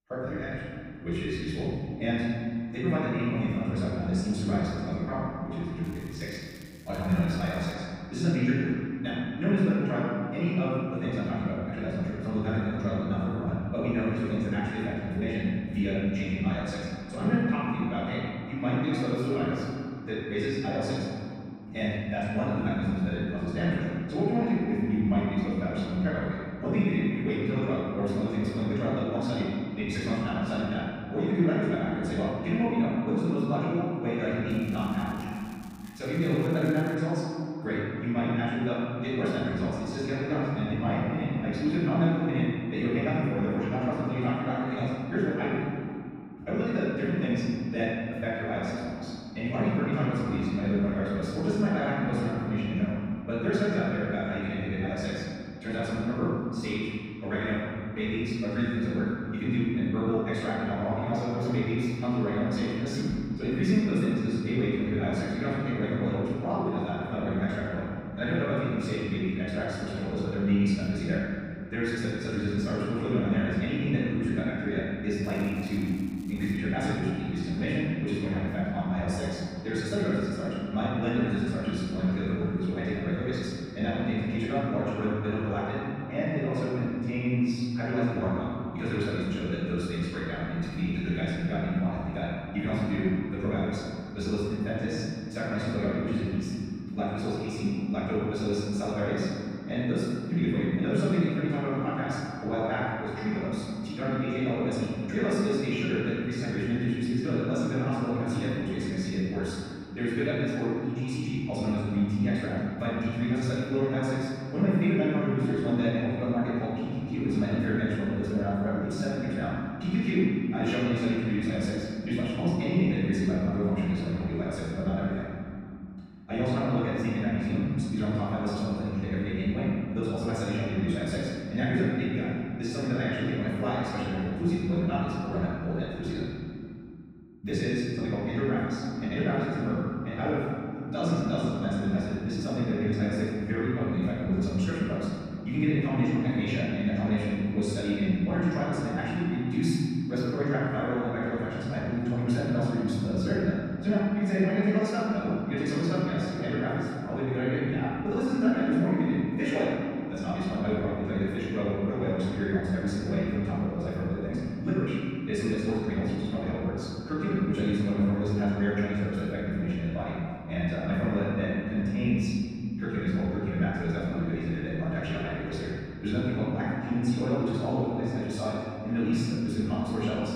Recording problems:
room echo; strong; dies away in 2.5 s
off-mic speech; far
wrong speed, natural pitch; too fast; 1.7 times normal speed
crackling; faint; from 6 to 7.5 s, from 34 to 37 s and from 1:15 to 1:17; 25 dB below the speech

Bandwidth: 15.5 kHz